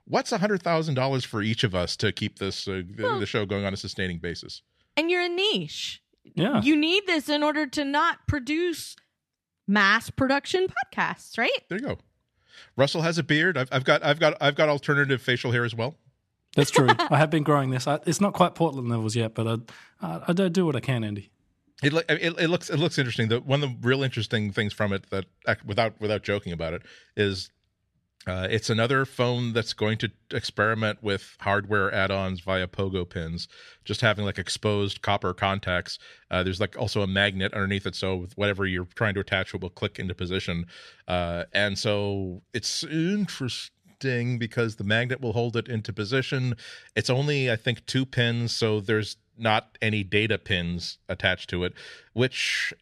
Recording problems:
none

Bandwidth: 13.5 kHz